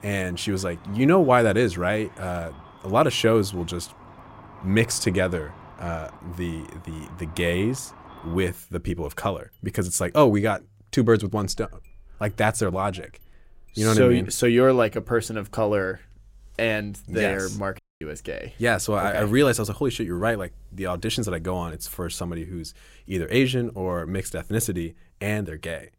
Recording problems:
traffic noise; faint; throughout; 25 dB below the speech
audio cutting out; at 18 s

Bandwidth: 16 kHz